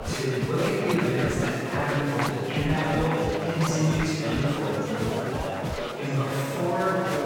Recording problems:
room echo; strong; dies away in 2.9 s
off-mic speech; far
background music; loud; throughout; 8 dB below the speech
chatter from many people; loud; throughout; 4 dB below the speech

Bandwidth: 18 kHz